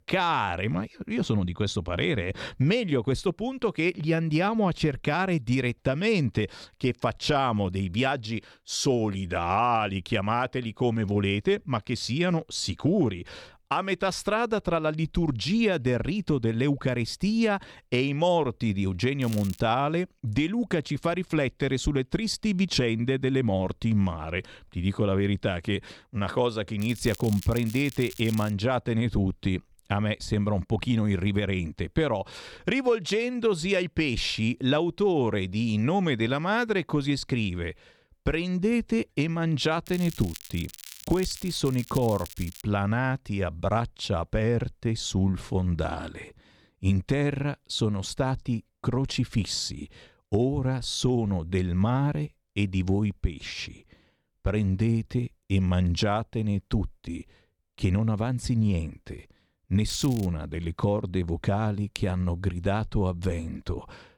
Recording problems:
crackling; noticeable; 4 times, first at 19 s; 15 dB below the speech

